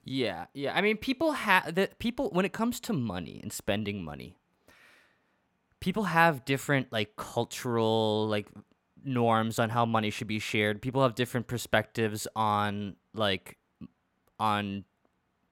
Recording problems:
none

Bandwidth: 16.5 kHz